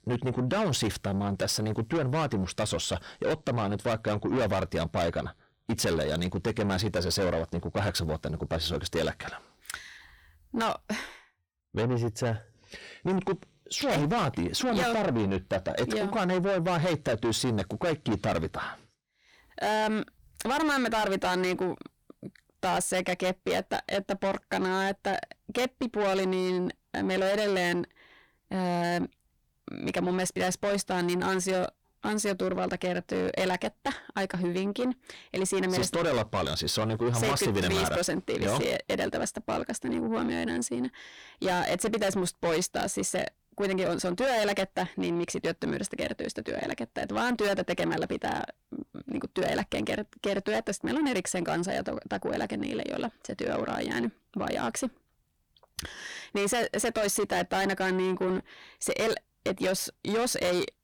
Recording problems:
distortion; heavy; 6 dB below the speech

